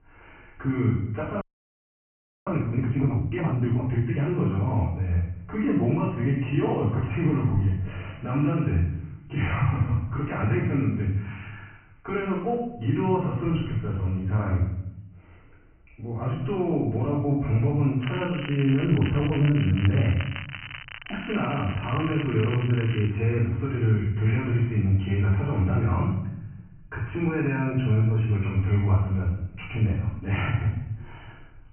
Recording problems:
off-mic speech; far
high frequencies cut off; severe; nothing above 3 kHz
room echo; noticeable; dies away in 0.8 s
crackling; noticeable; from 18 to 23 s; 10 dB below the speech
audio freezing; at 1.5 s for 1 s

